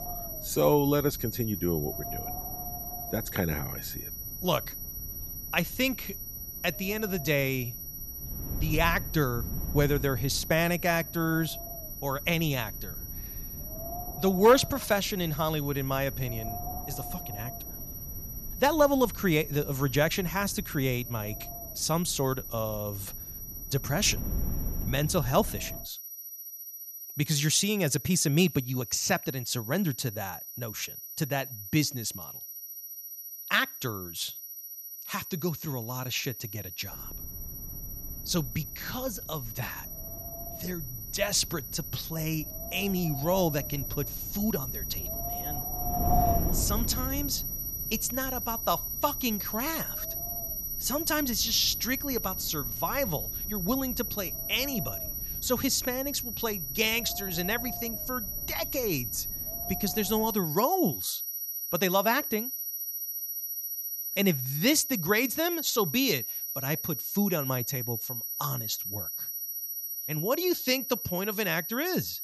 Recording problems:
high-pitched whine; loud; throughout; 12 kHz, 6 dB below the speech
wind noise on the microphone; occasional gusts; until 26 s and from 37 s to 1:00; 10 dB below the speech

